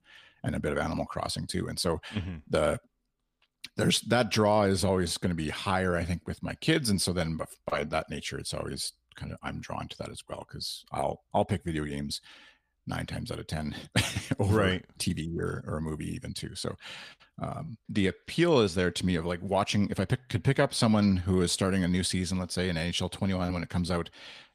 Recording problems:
none

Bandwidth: 15 kHz